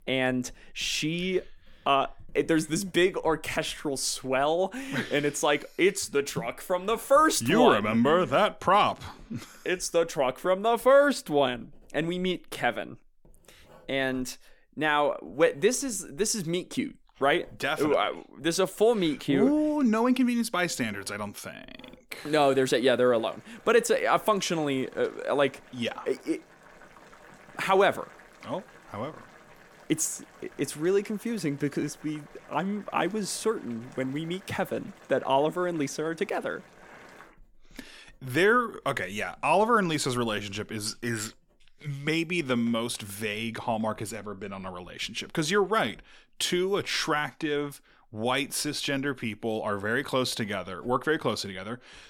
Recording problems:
household noises; faint; throughout; 30 dB below the speech

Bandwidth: 18 kHz